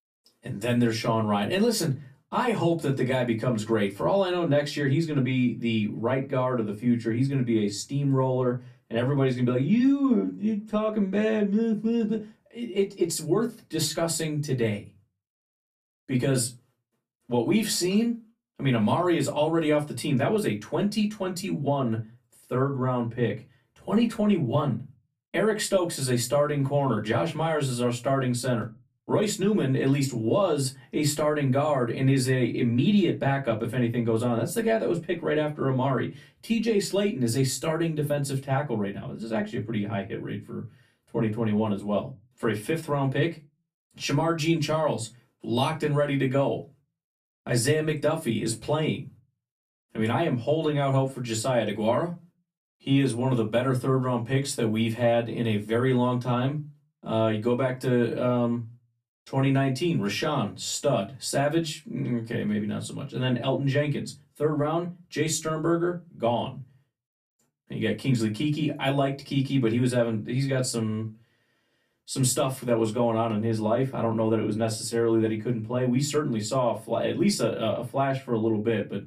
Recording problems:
off-mic speech; far
room echo; very slight; dies away in 0.2 s

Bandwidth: 14.5 kHz